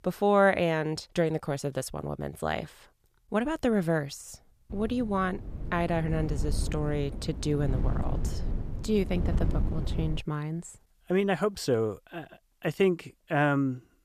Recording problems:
wind noise on the microphone; occasional gusts; from 4.5 to 10 s; 15 dB below the speech

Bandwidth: 14.5 kHz